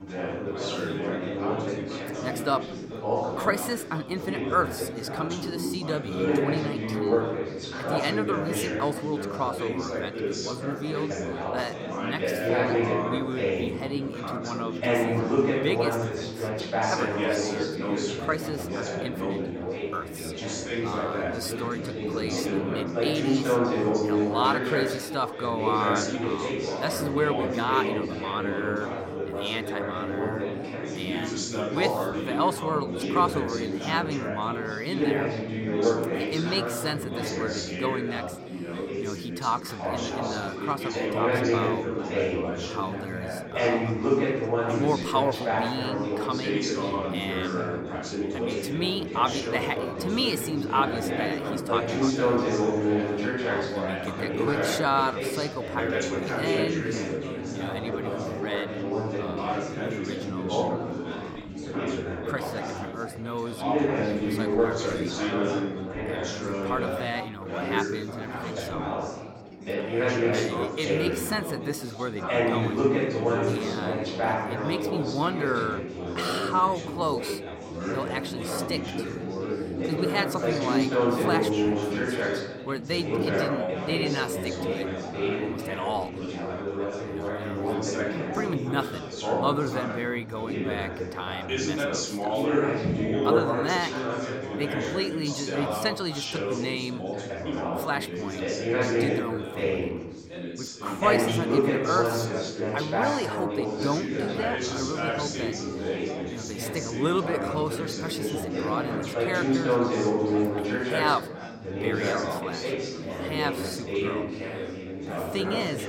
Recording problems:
chatter from many people; very loud; throughout; 3 dB above the speech

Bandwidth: 16.5 kHz